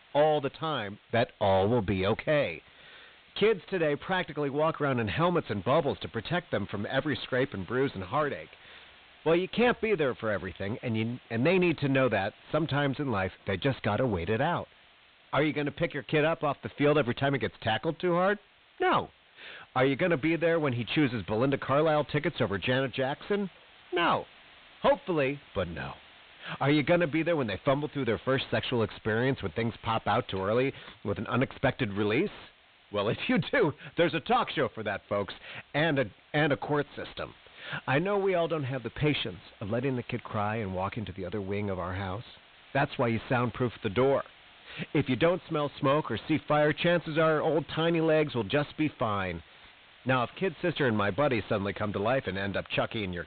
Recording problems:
high frequencies cut off; severe; nothing above 4 kHz
distortion; slight; 9 dB below the speech
hiss; faint; throughout; 25 dB below the speech

